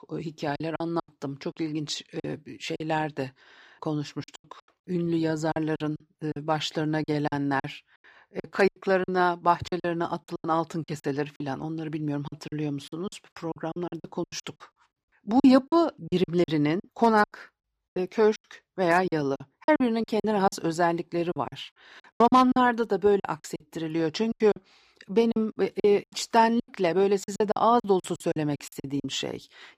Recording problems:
choppy; very; 15% of the speech affected

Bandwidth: 15 kHz